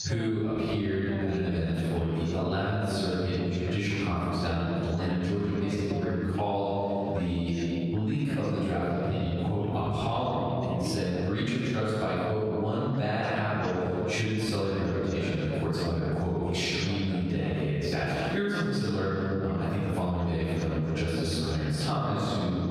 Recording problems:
room echo; strong; dies away in 2.2 s
off-mic speech; far
squashed, flat; somewhat
voice in the background; noticeable; throughout; 15 dB below the speech

